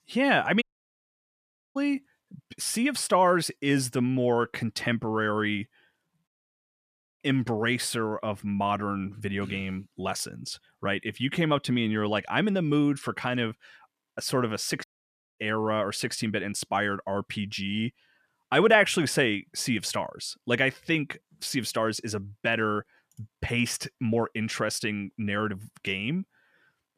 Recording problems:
audio cutting out; at 0.5 s for 1 s, at 6.5 s for 1 s and at 15 s for 0.5 s

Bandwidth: 14.5 kHz